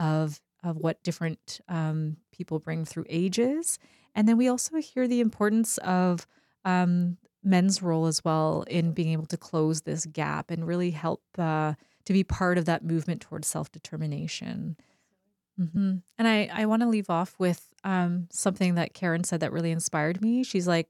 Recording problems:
abrupt cut into speech; at the start

